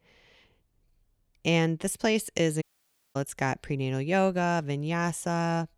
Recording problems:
audio cutting out; at 2.5 s for 0.5 s

